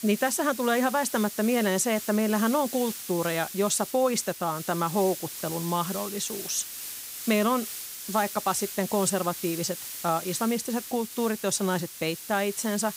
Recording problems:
hiss; loud; throughout; 8 dB below the speech

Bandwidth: 15.5 kHz